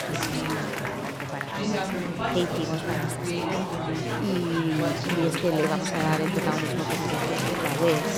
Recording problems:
chatter from many people; very loud; throughout; 2 dB above the speech

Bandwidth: 17 kHz